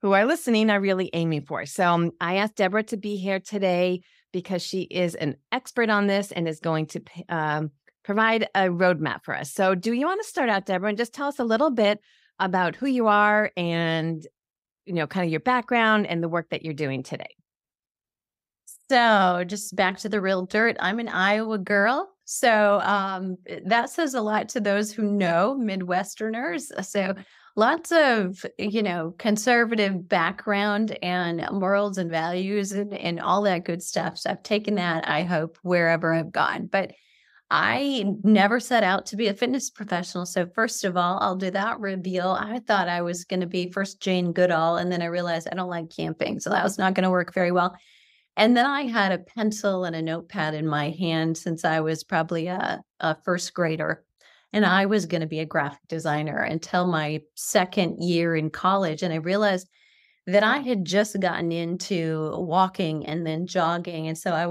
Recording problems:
abrupt cut into speech; at the end

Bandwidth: 15.5 kHz